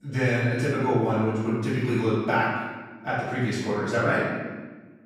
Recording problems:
room echo; strong; dies away in 1.3 s
off-mic speech; far

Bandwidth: 15 kHz